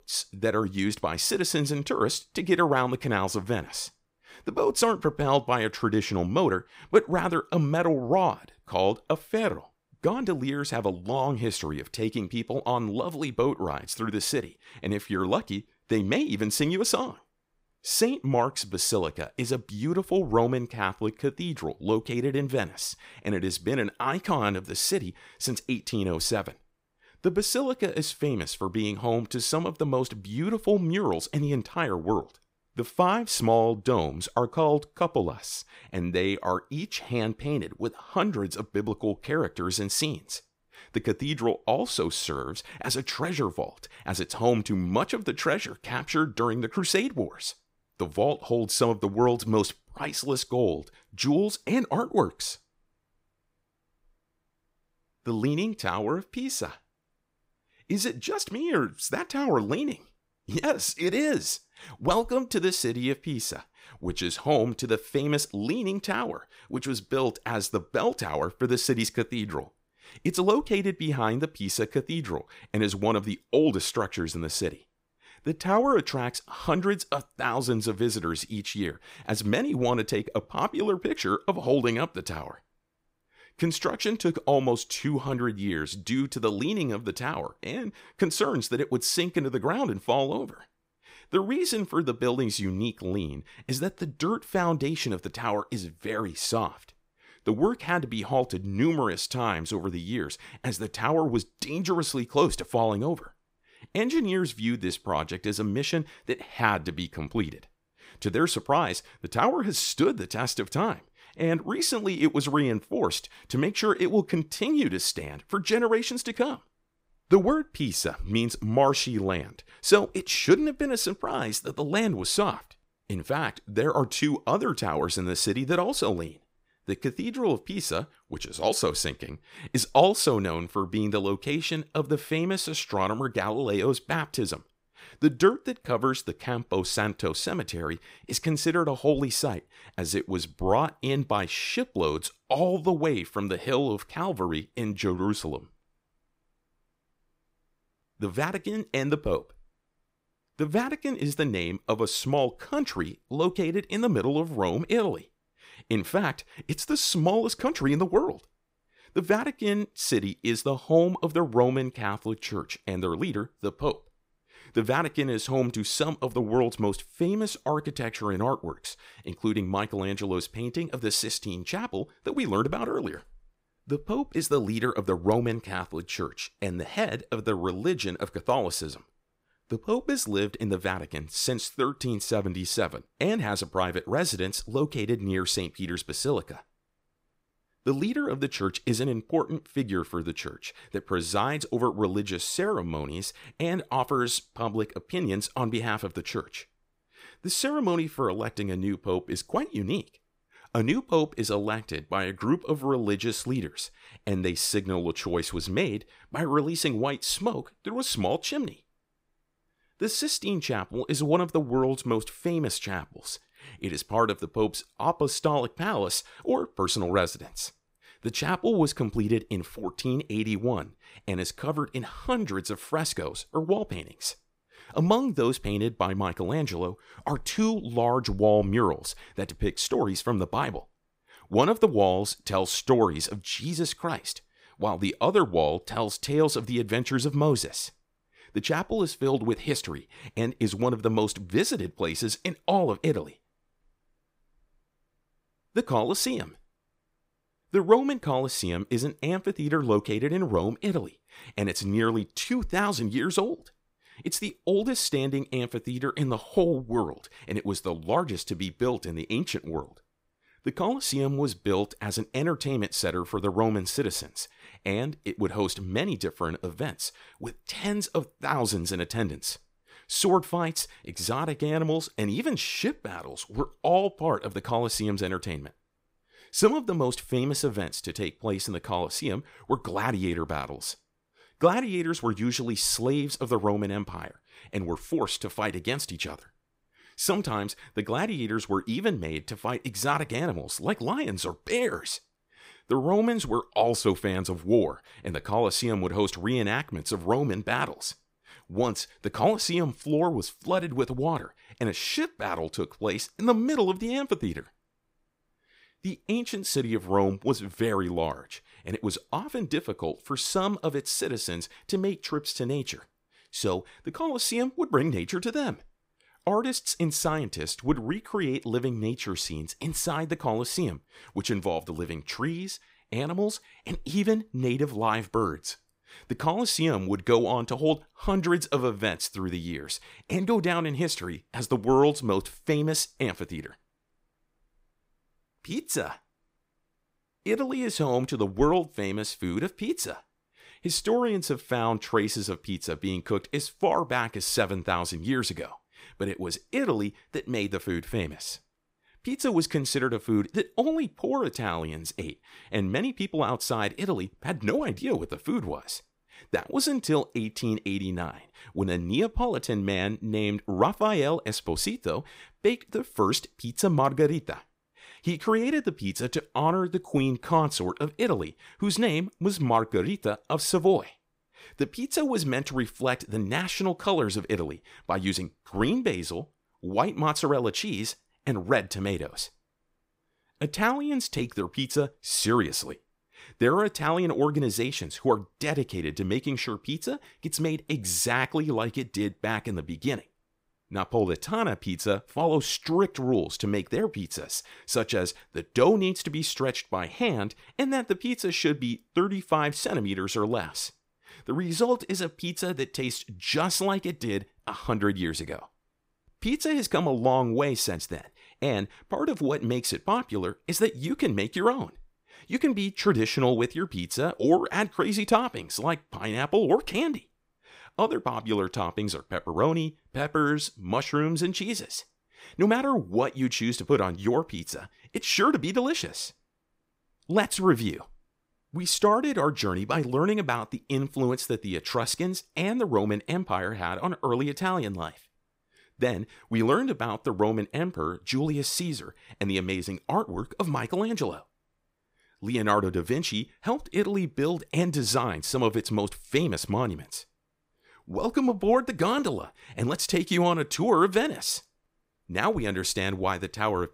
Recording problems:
none

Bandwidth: 15.5 kHz